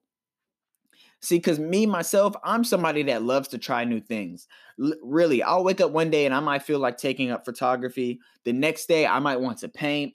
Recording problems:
none

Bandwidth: 14.5 kHz